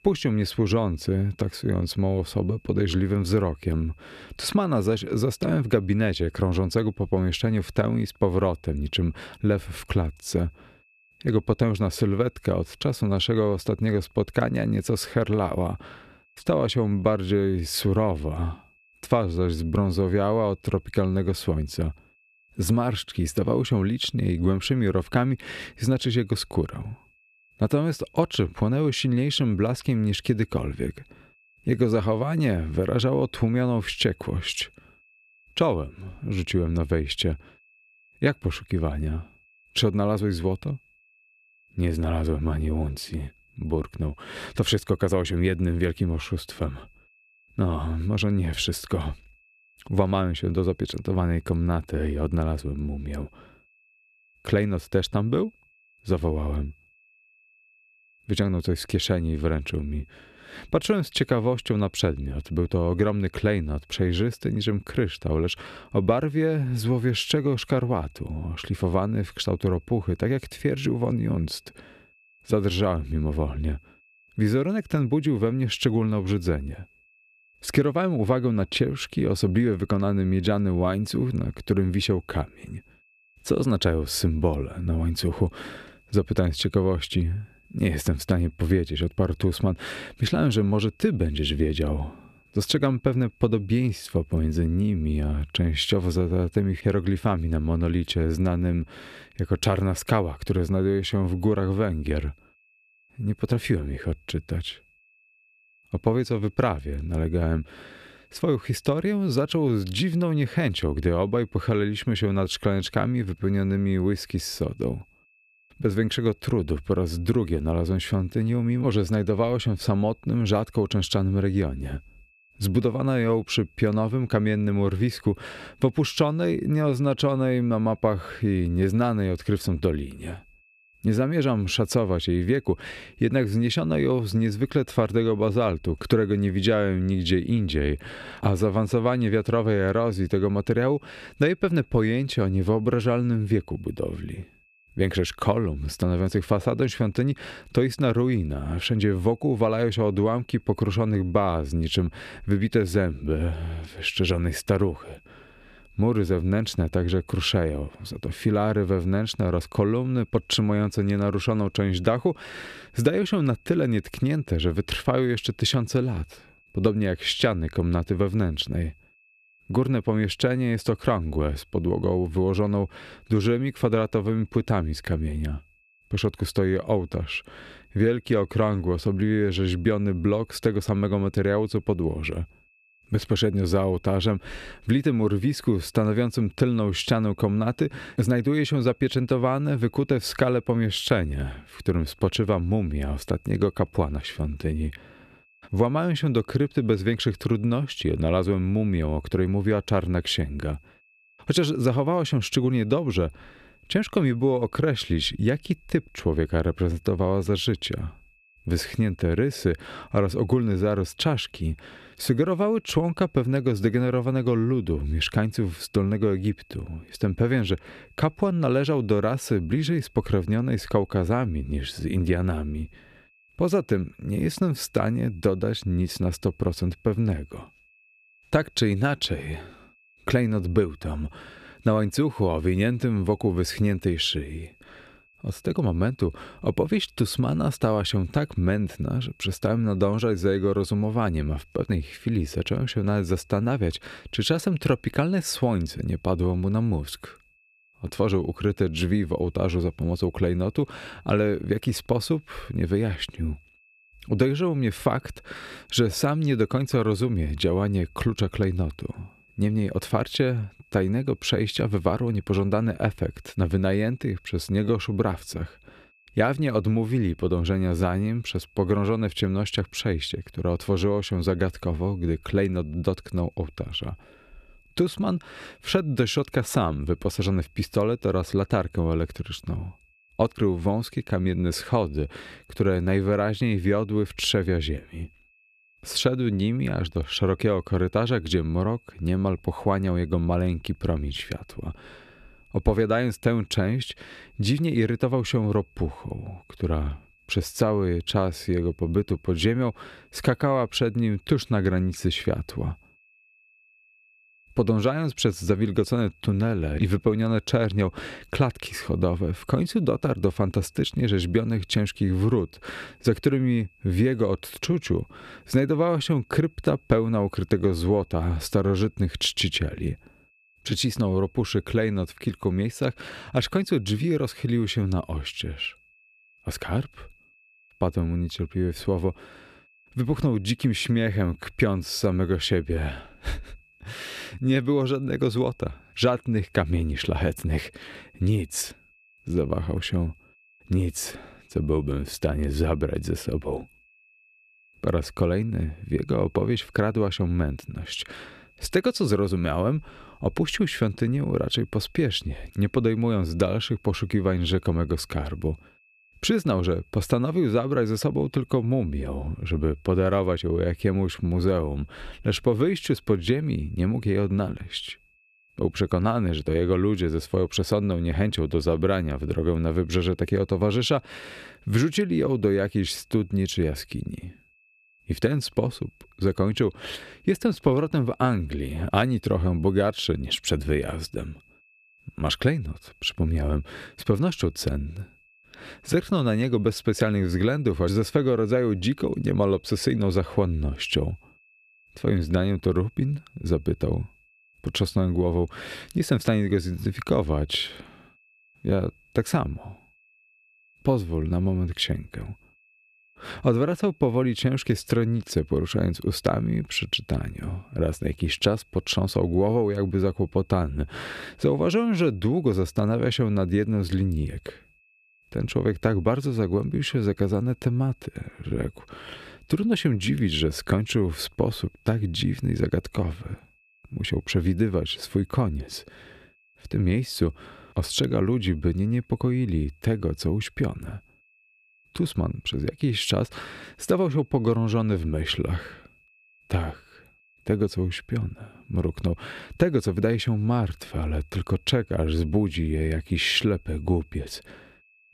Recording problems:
high-pitched whine; faint; throughout; 2.5 kHz, 35 dB below the speech

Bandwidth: 14.5 kHz